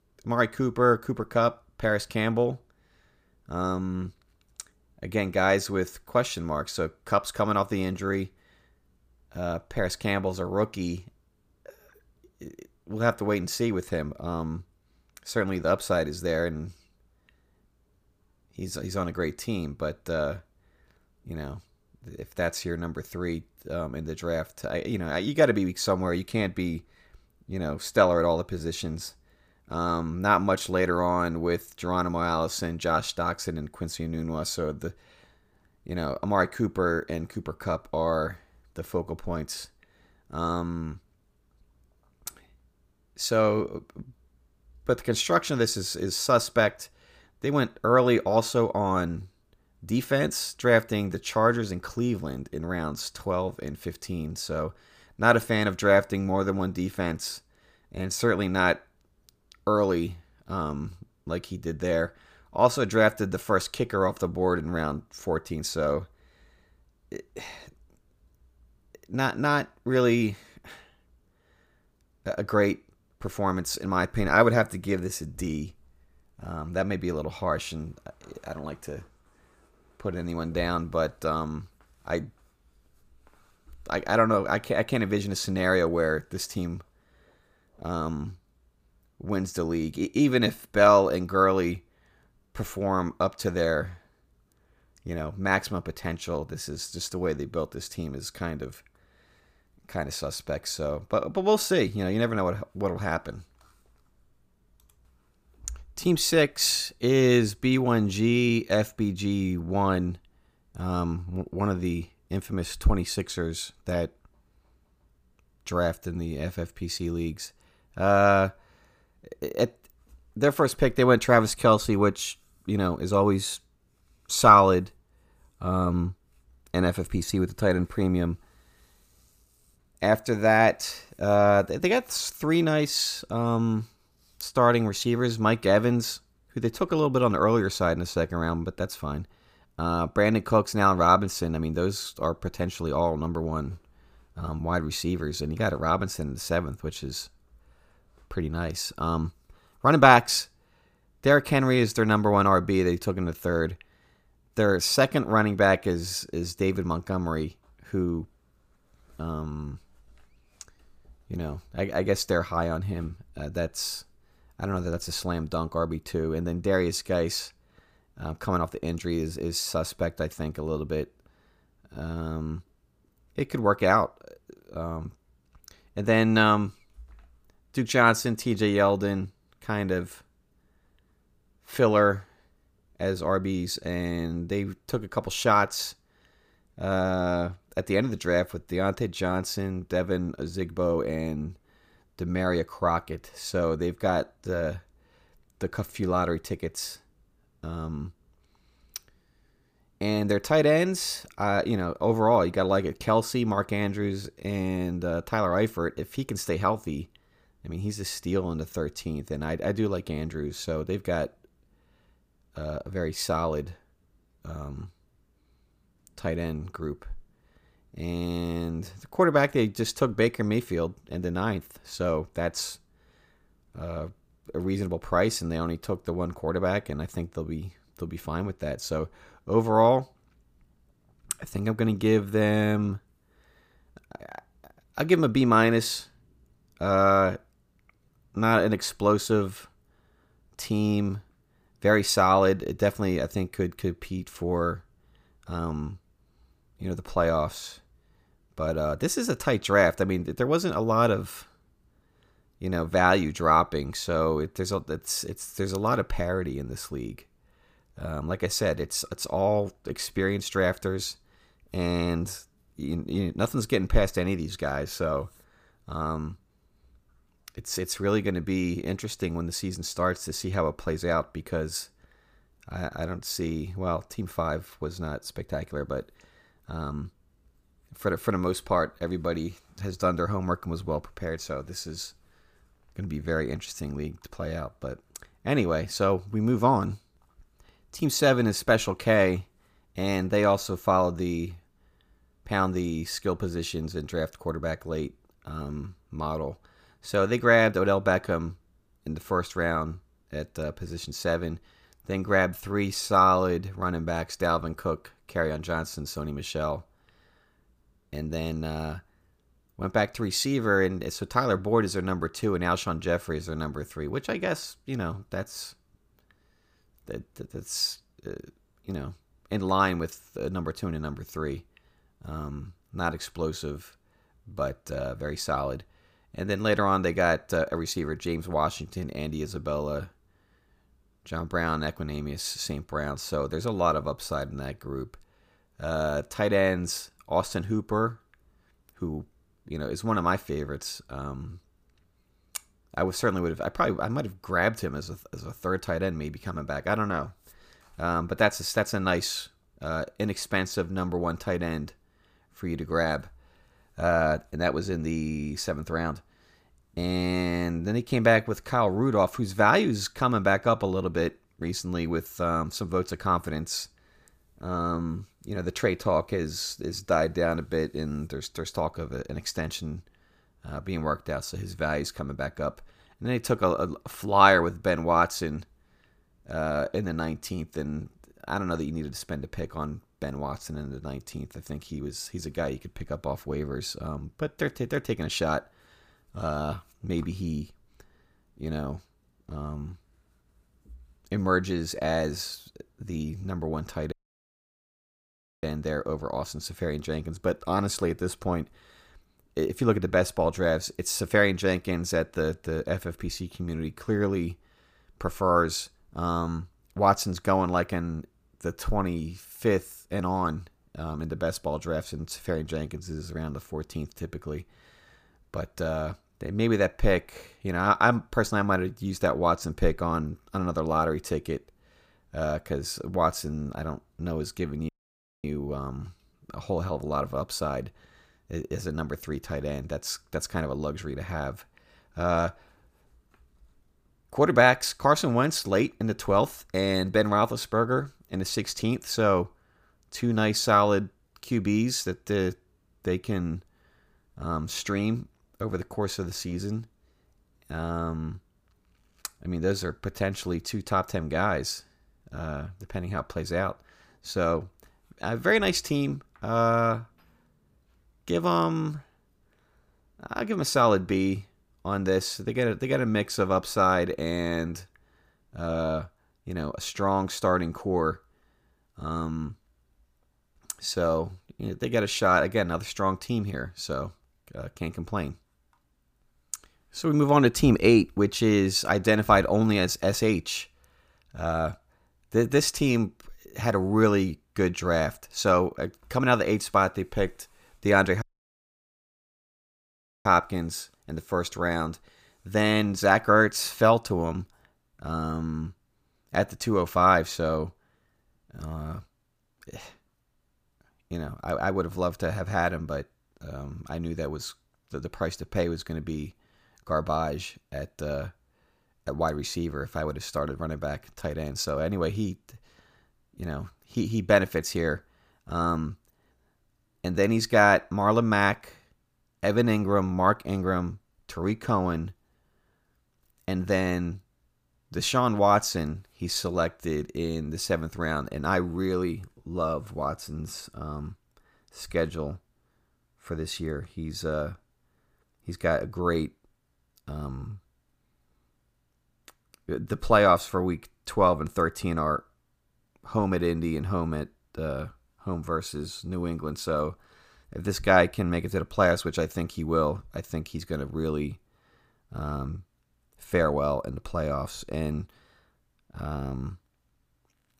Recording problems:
audio cutting out; at 6:34 for 1.5 s, at 7:05 for 0.5 s and at 8:08 for 2 s

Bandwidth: 15 kHz